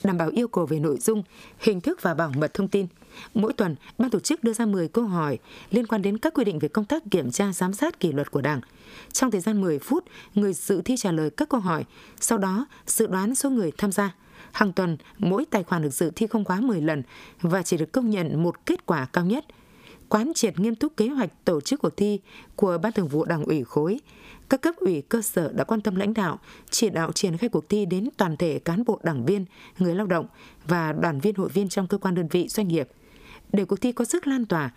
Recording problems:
squashed, flat; somewhat

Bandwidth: 15 kHz